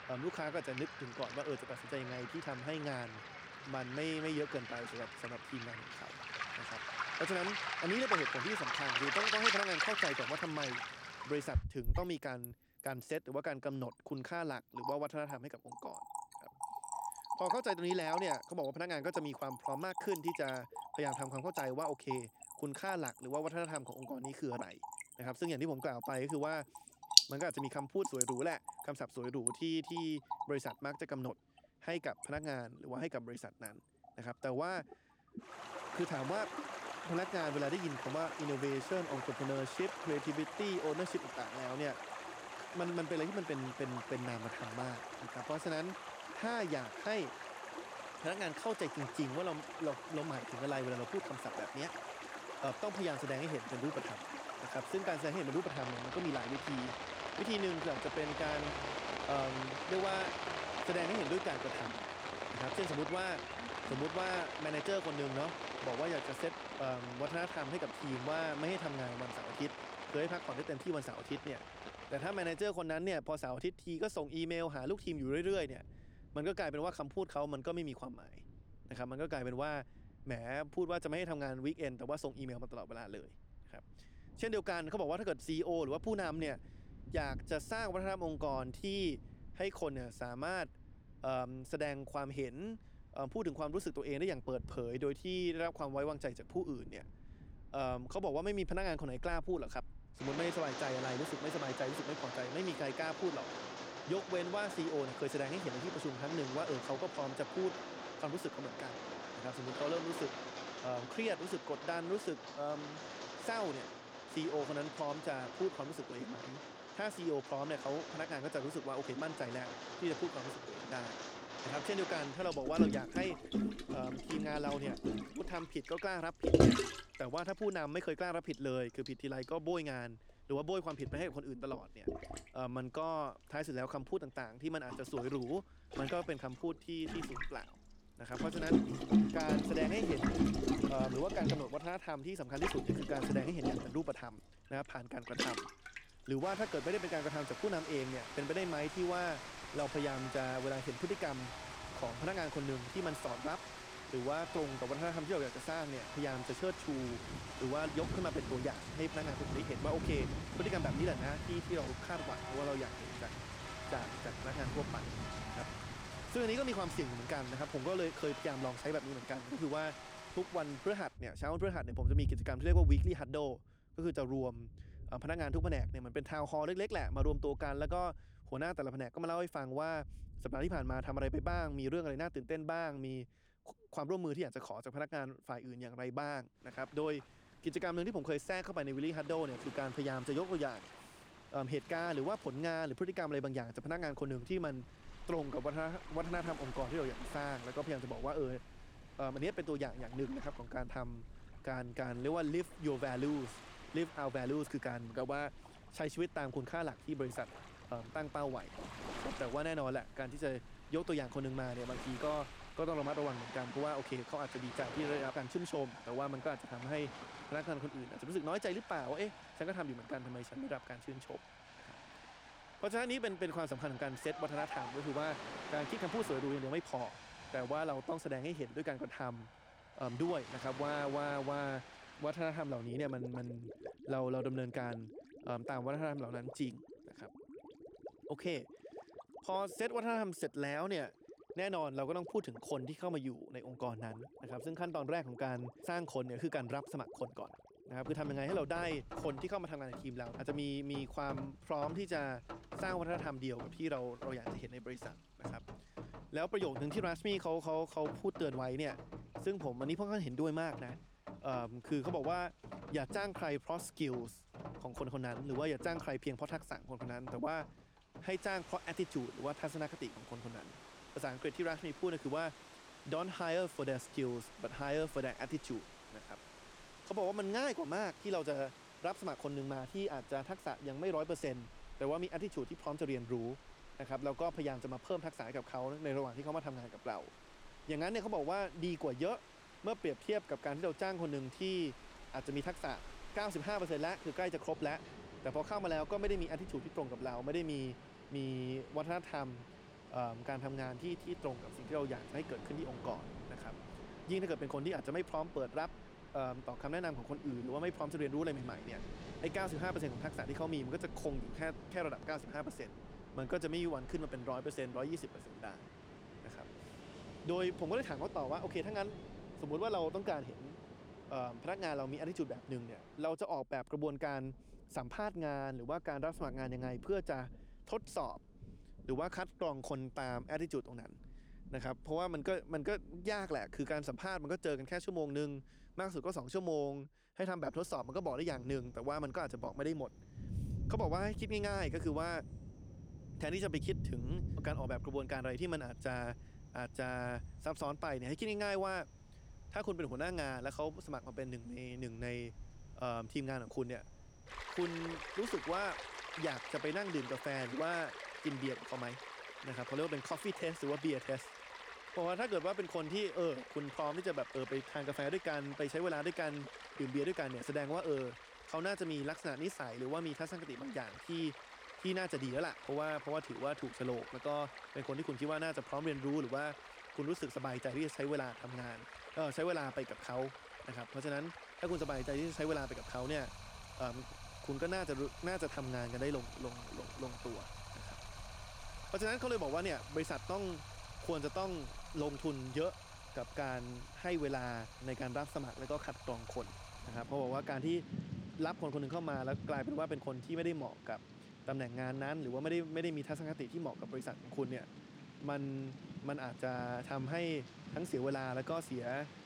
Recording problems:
rain or running water; loud; throughout; 4 dB below the speech

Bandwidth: 18.5 kHz